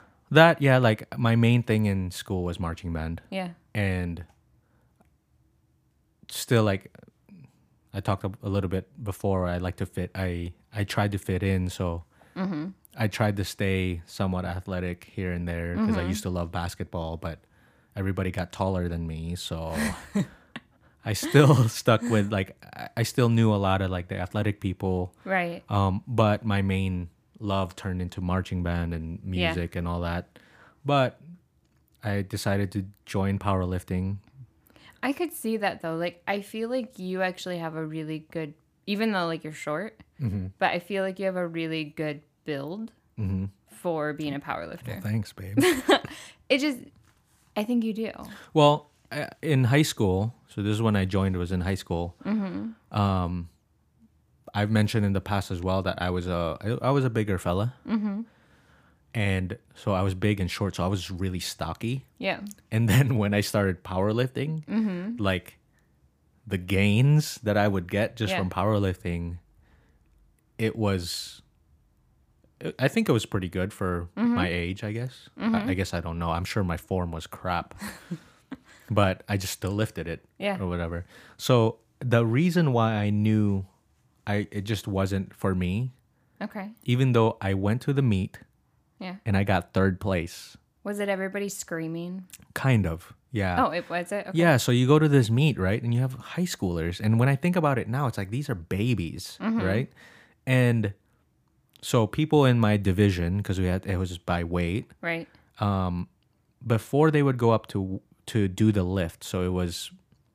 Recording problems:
none

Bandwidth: 15 kHz